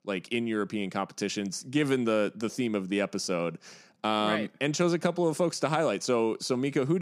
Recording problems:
abrupt cut into speech; at the end

